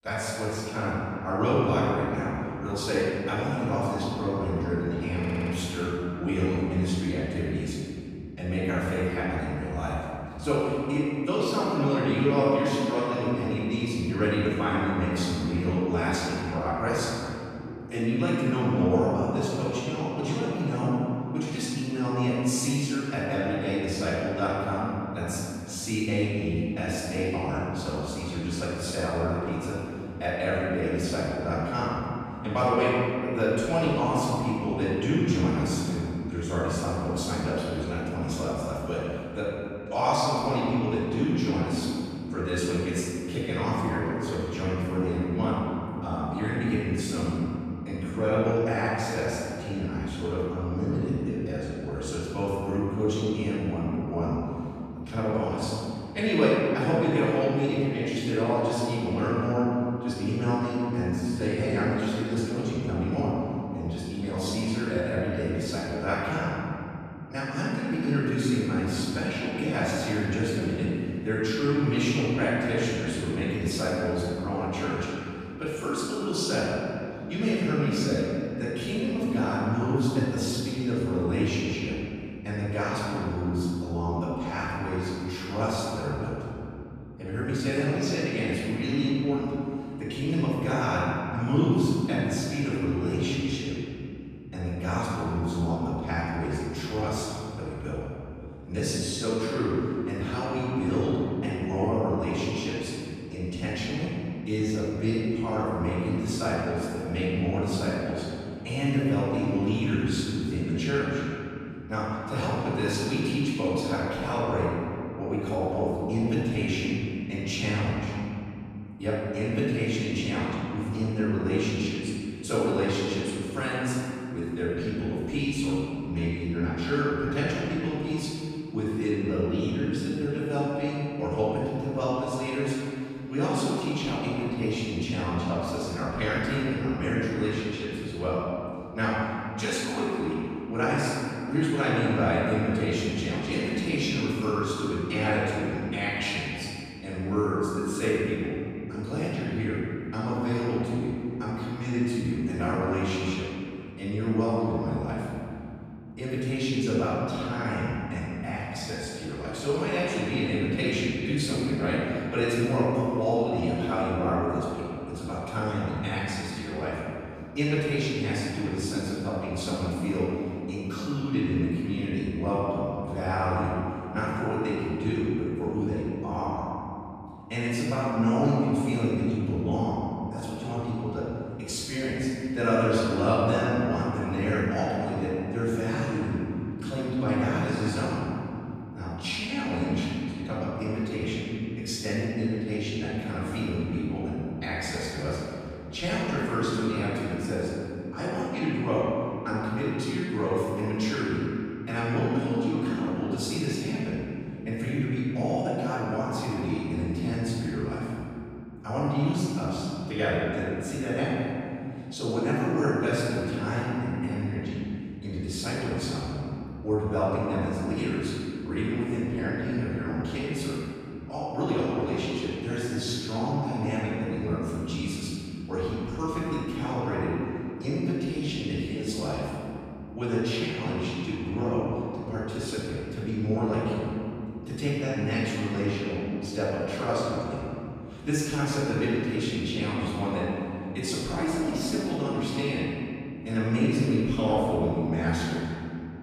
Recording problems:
room echo; strong; dies away in 2.9 s
off-mic speech; far
audio stuttering; at 5 s

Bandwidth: 15.5 kHz